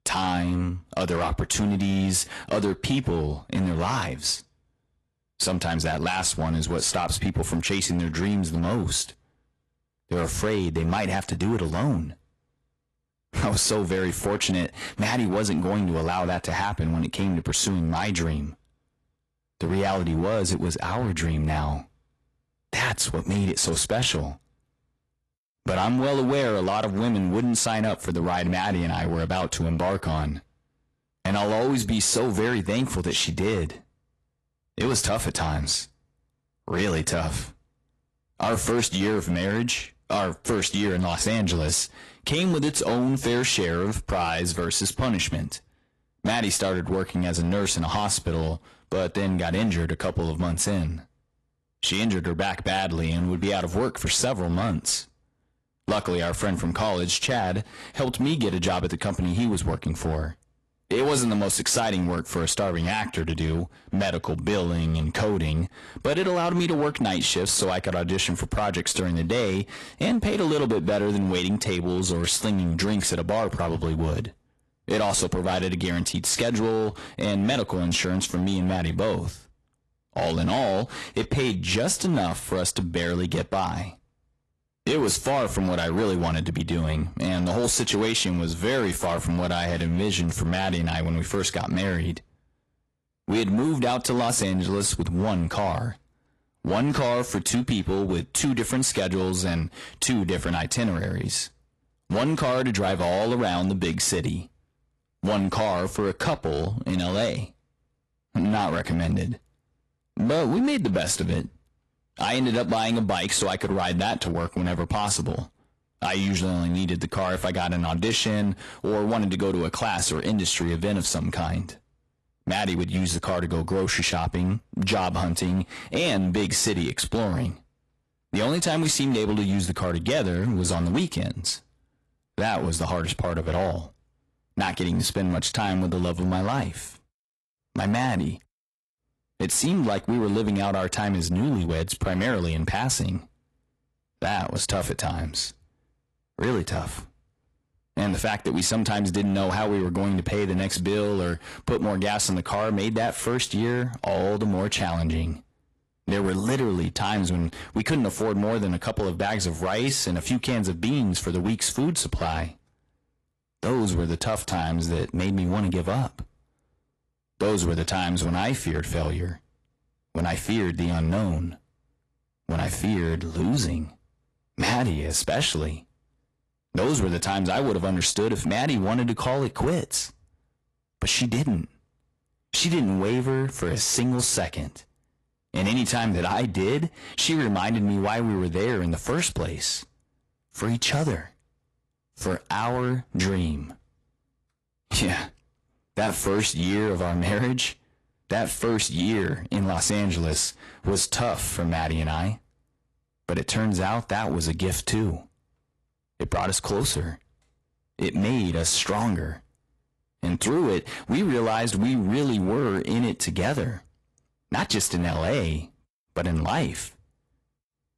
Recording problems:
distortion; slight; 8% of the sound clipped
garbled, watery; slightly; nothing above 11.5 kHz

